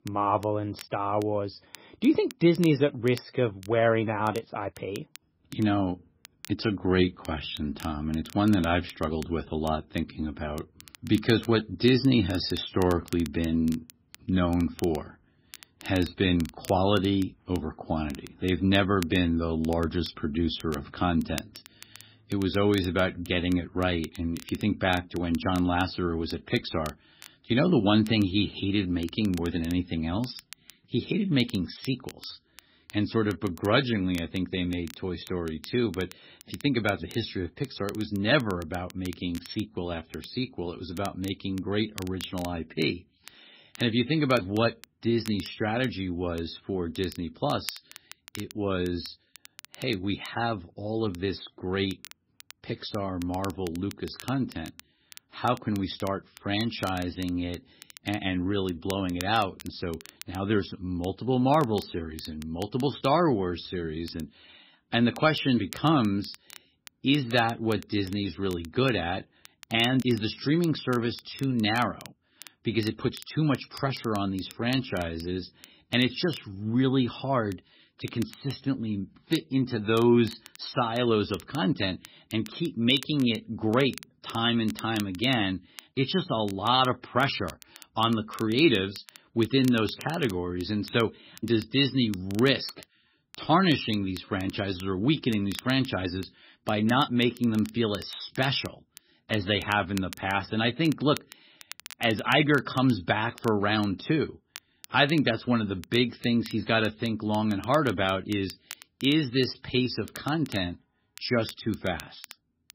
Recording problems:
garbled, watery; badly; nothing above 5.5 kHz
crackle, like an old record; faint; 20 dB below the speech

